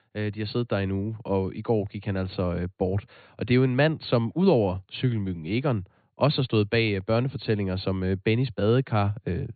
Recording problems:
high frequencies cut off; severe; nothing above 4.5 kHz

